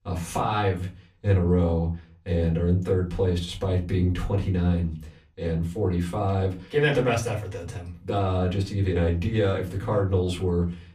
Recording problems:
off-mic speech; far
room echo; very slight; dies away in 0.3 s

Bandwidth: 15 kHz